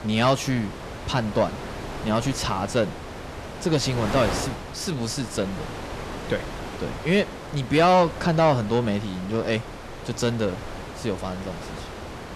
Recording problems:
distortion; slight; 10 dB below the speech
wind noise on the microphone; occasional gusts; 10 dB below the speech

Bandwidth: 13.5 kHz